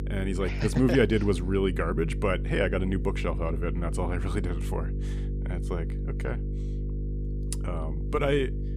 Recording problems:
electrical hum; noticeable; throughout; 50 Hz, 15 dB below the speech

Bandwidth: 15 kHz